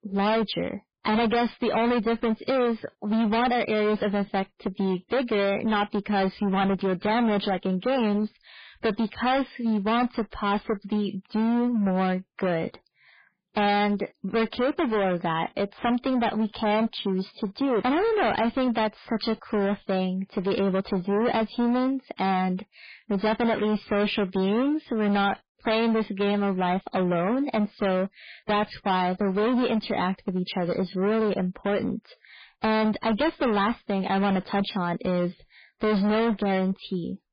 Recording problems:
distortion; heavy; 24% of the sound clipped
garbled, watery; badly; nothing above 4.5 kHz

